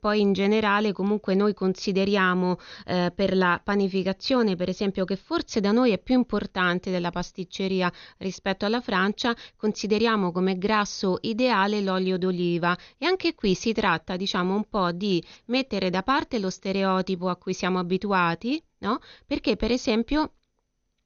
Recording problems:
garbled, watery; slightly; nothing above 6.5 kHz

